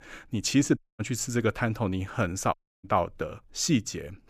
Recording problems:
audio cutting out; at 1 s and at 2.5 s

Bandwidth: 15 kHz